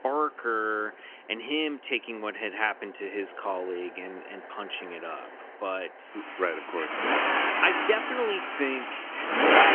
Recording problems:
phone-call audio; nothing above 3 kHz
traffic noise; very loud; throughout; 4 dB above the speech

